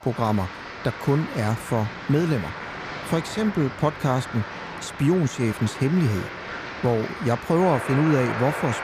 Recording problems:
crowd noise; loud; throughout; 9 dB below the speech

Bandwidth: 15 kHz